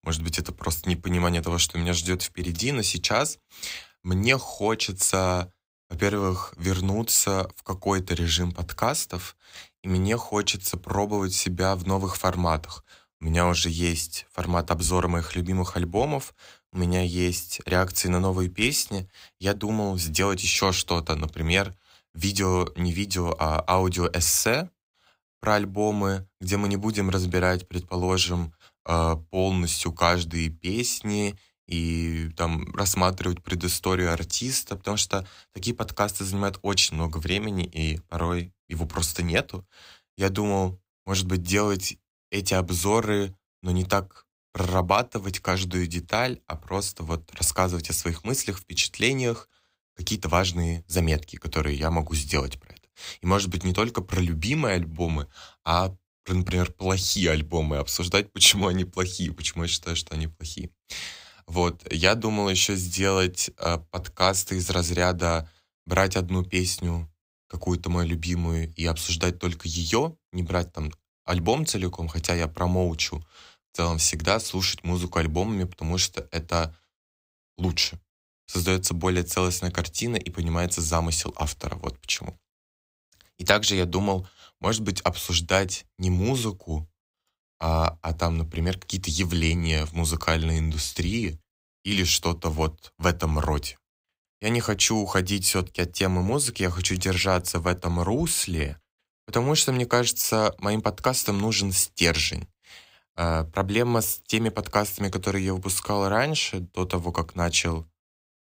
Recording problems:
none

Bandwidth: 15.5 kHz